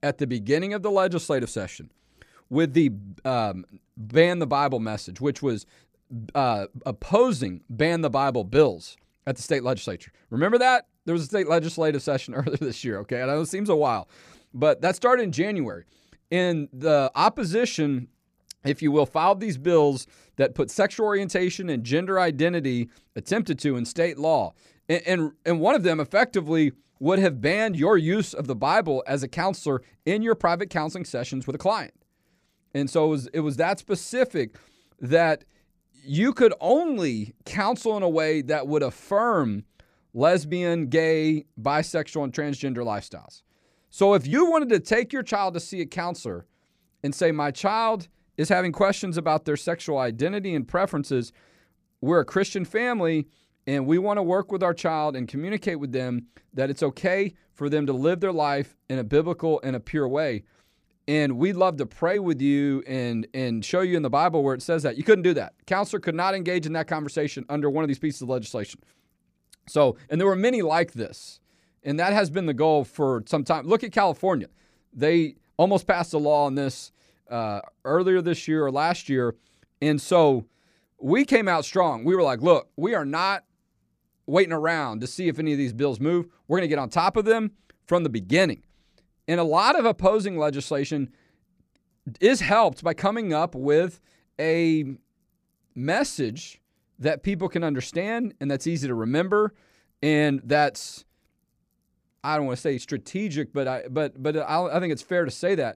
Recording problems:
none

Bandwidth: 14.5 kHz